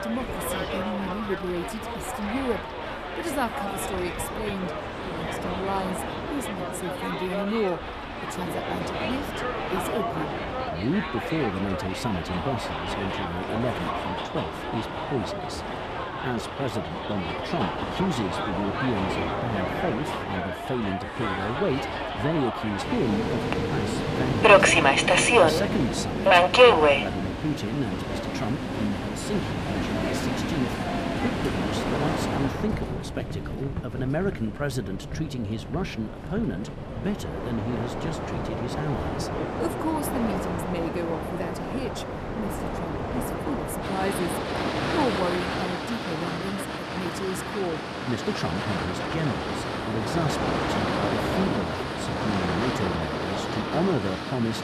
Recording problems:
train or aircraft noise; very loud; throughout; 4 dB above the speech

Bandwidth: 14 kHz